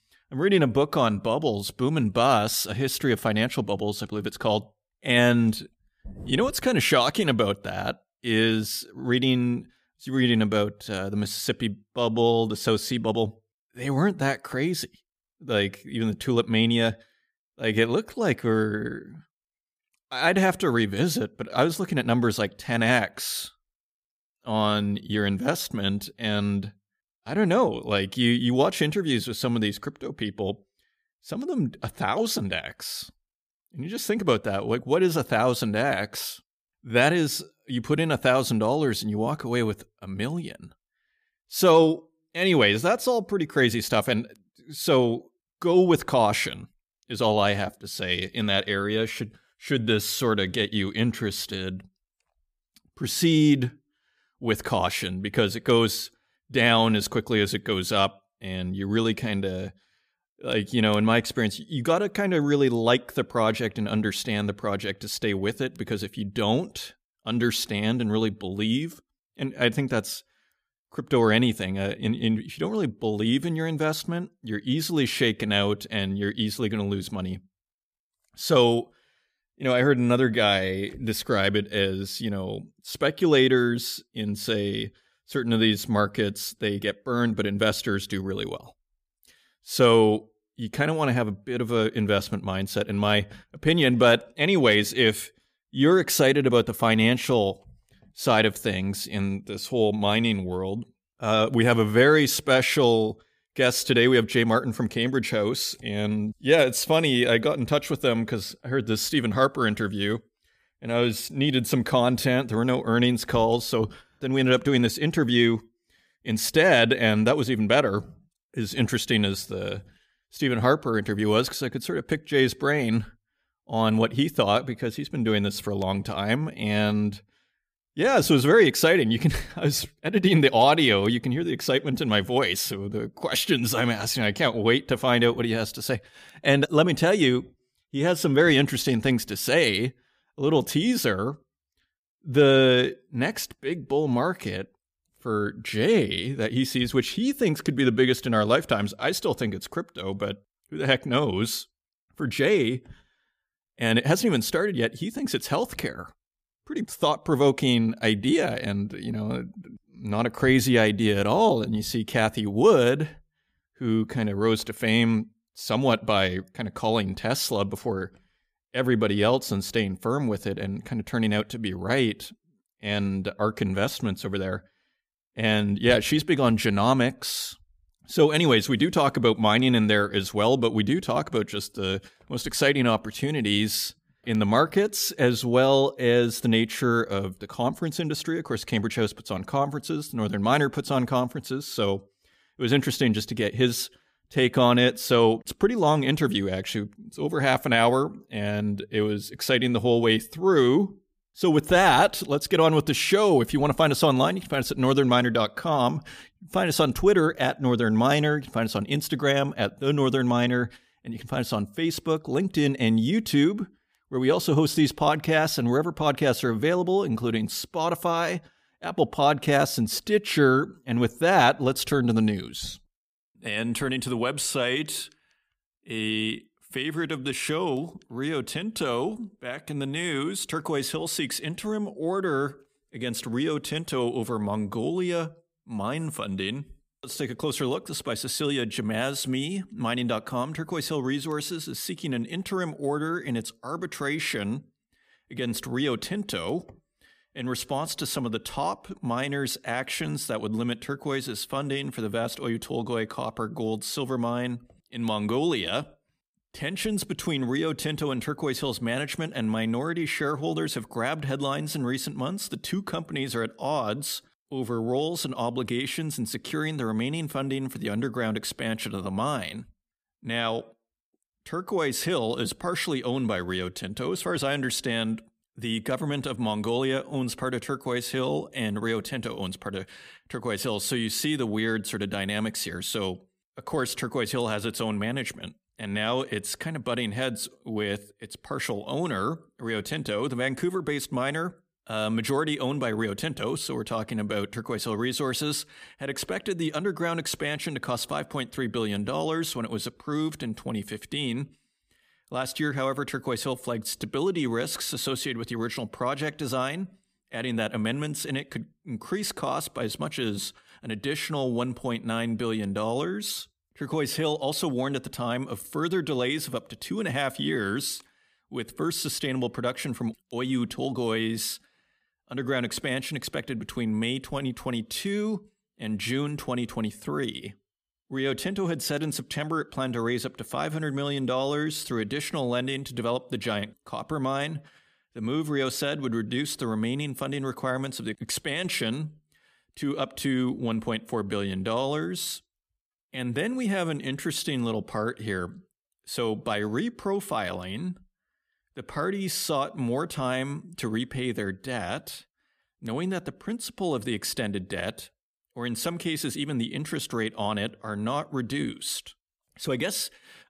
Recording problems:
none

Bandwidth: 15 kHz